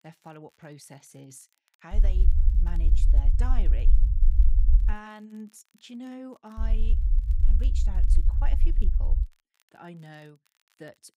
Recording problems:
low rumble; loud; from 2 to 5 s and from 6.5 to 9 s; 4 dB below the speech
crackle, like an old record; faint; 25 dB below the speech

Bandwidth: 15.5 kHz